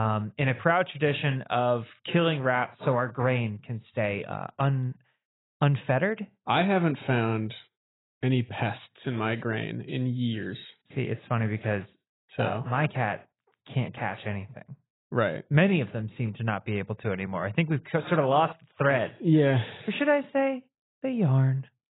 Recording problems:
garbled, watery; badly; nothing above 4 kHz
abrupt cut into speech; at the start

